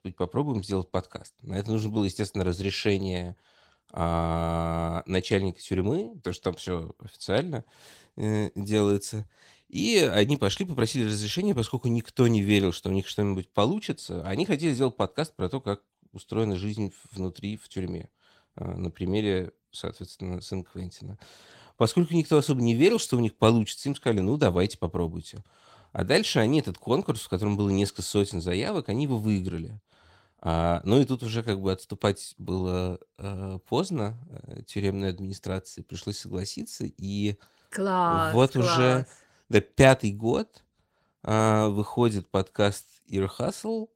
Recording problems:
garbled, watery; slightly; nothing above 16 kHz

